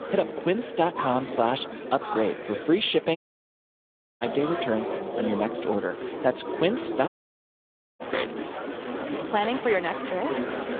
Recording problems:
phone-call audio
chatter from many people; loud; throughout; 6 dB below the speech
alarms or sirens; noticeable; throughout; 15 dB below the speech
audio cutting out; at 3 s for 1 s and at 7 s for 1 s

